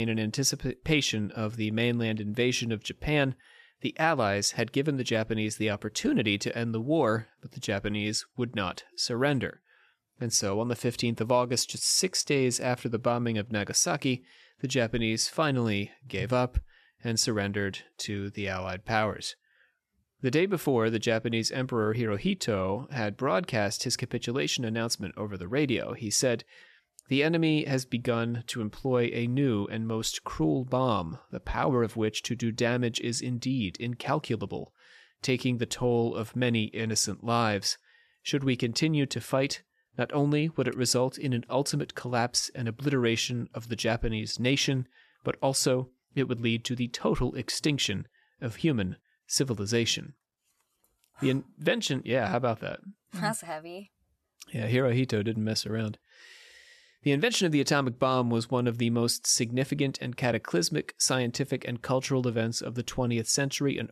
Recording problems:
abrupt cut into speech; at the start

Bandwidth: 13.5 kHz